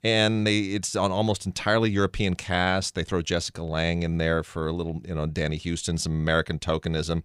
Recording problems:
none

